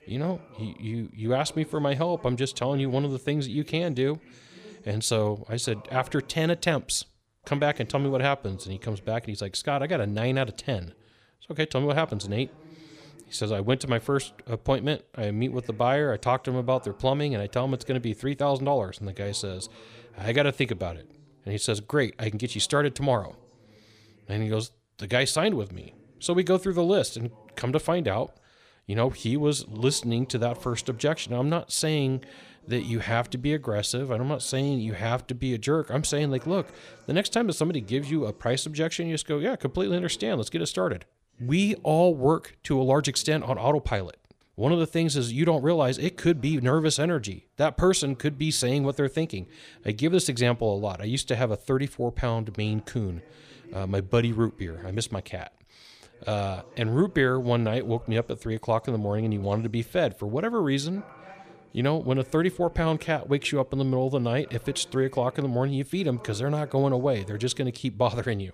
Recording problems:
voice in the background; faint; throughout; 25 dB below the speech

